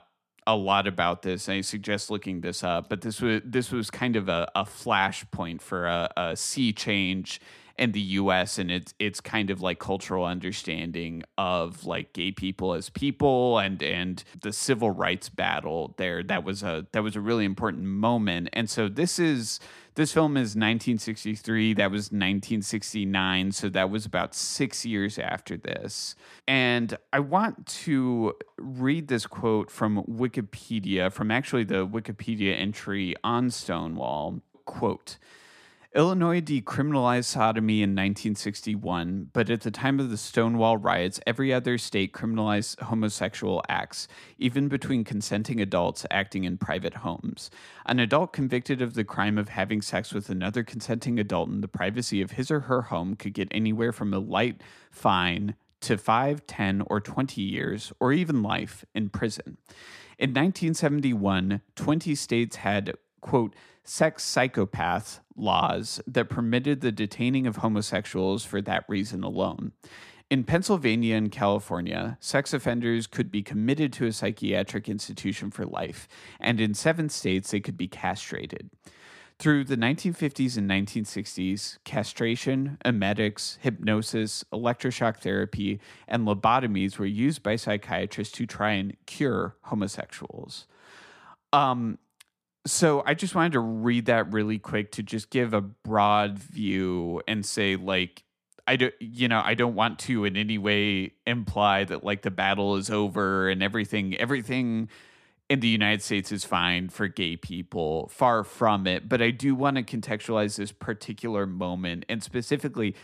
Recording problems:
none

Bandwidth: 14.5 kHz